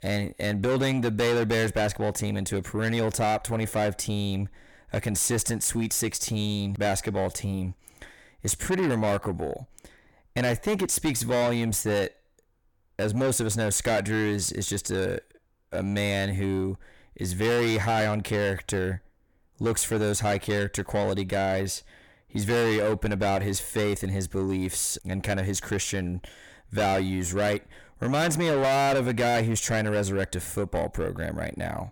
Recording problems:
distortion; heavy; 6 dB below the speech

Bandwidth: 17.5 kHz